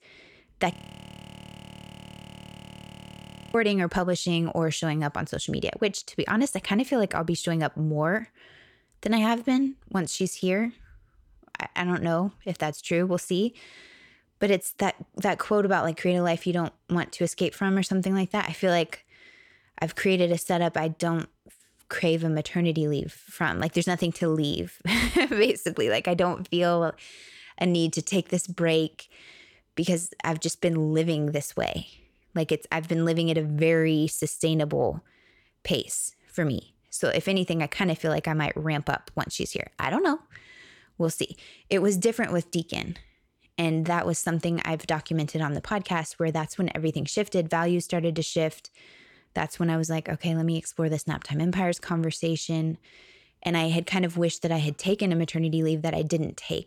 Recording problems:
audio freezing; at 0.5 s for 3 s

